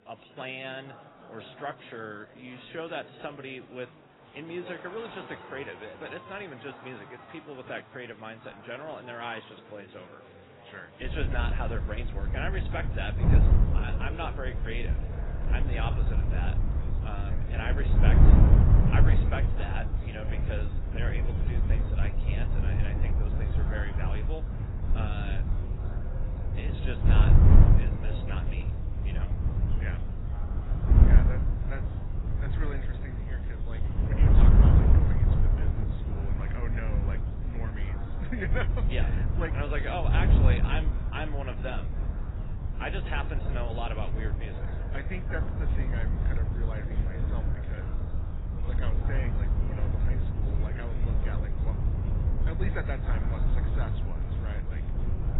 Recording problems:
garbled, watery; badly; nothing above 4 kHz
wind noise on the microphone; heavy; from 11 s on; 2 dB below the speech
murmuring crowd; noticeable; throughout; 10 dB below the speech
animal sounds; faint; throughout; 25 dB below the speech

